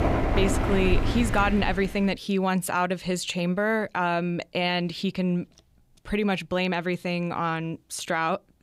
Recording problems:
rain or running water; loud; until 2 s; 2 dB below the speech

